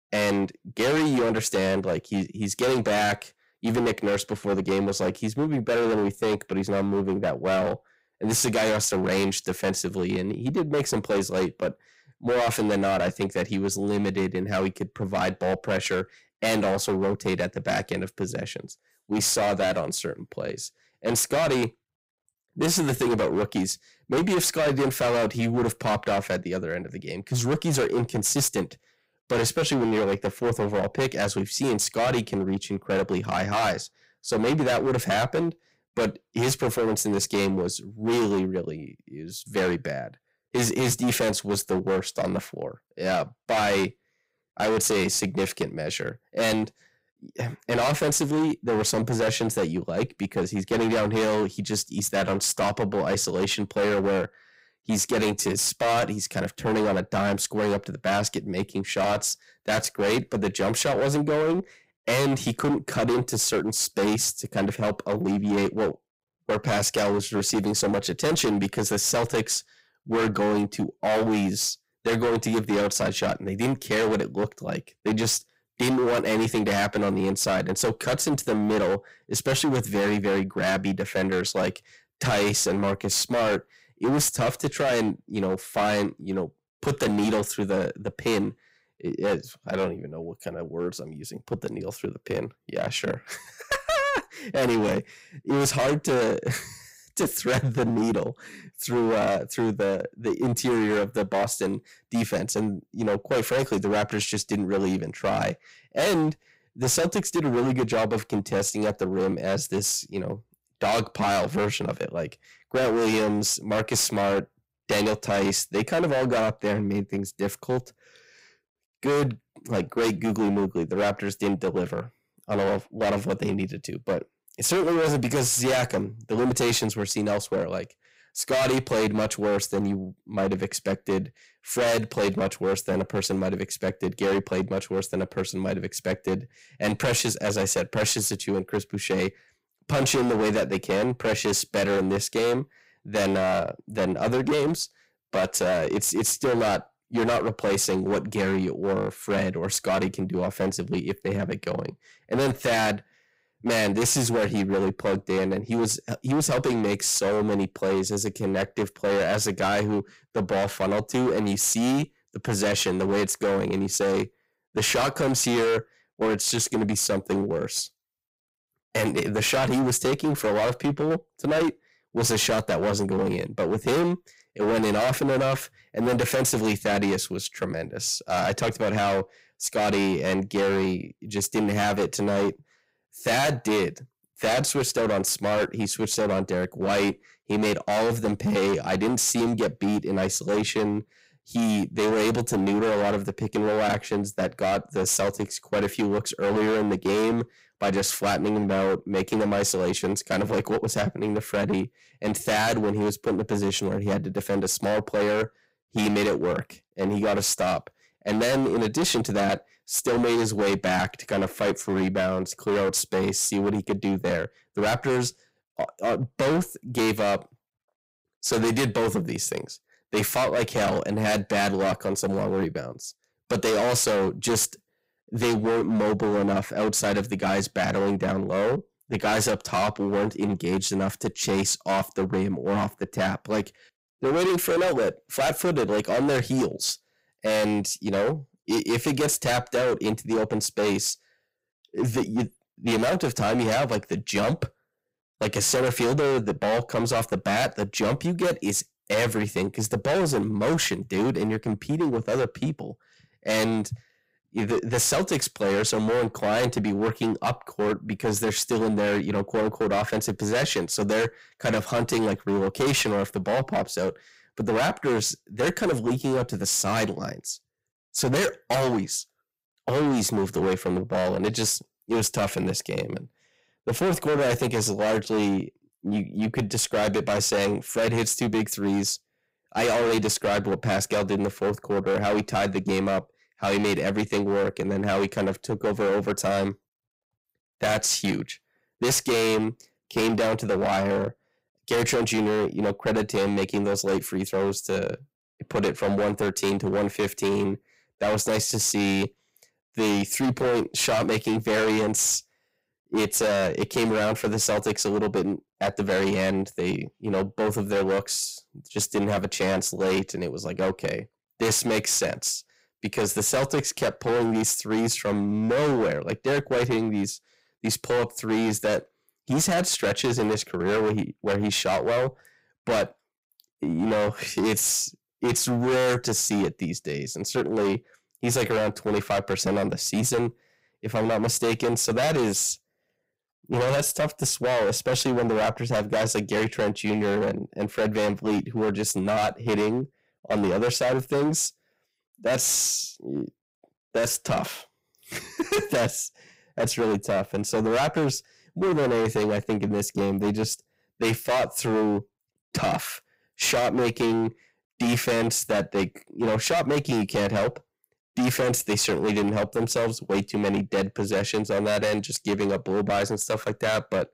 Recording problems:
distortion; heavy; 18% of the sound clipped

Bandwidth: 15.5 kHz